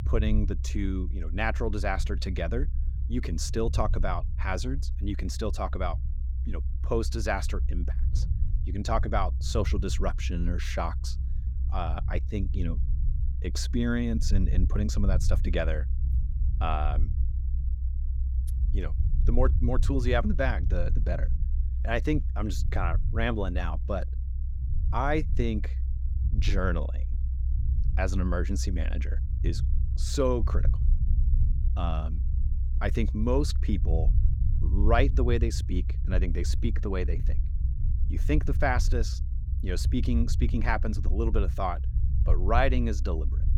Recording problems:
low rumble; noticeable; throughout; 15 dB below the speech

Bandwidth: 18 kHz